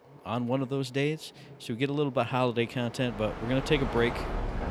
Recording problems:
train or aircraft noise; loud; throughout; 8 dB below the speech

